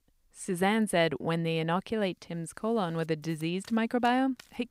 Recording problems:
household noises; faint; throughout; 25 dB below the speech

